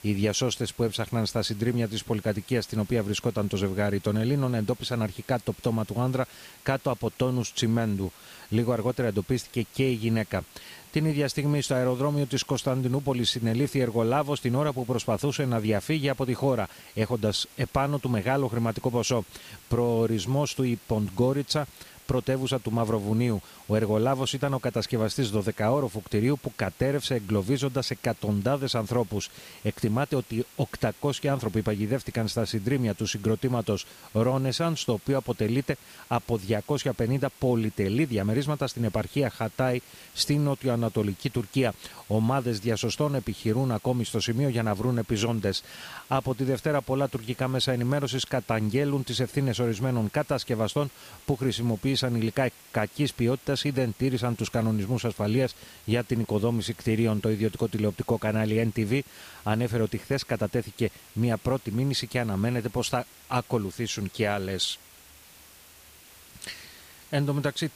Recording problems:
hiss; faint; throughout; 20 dB below the speech

